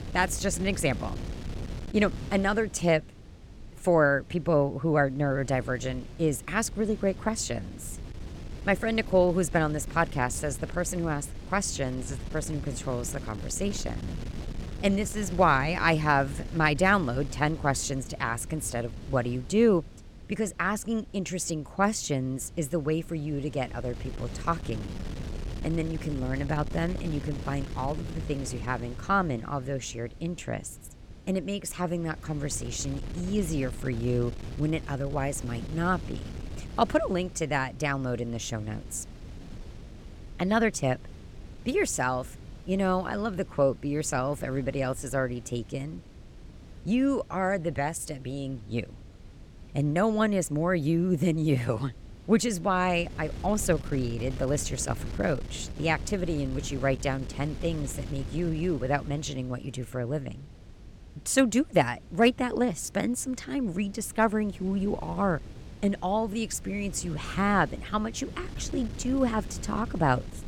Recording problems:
wind noise on the microphone; occasional gusts; 20 dB below the speech

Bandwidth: 17.5 kHz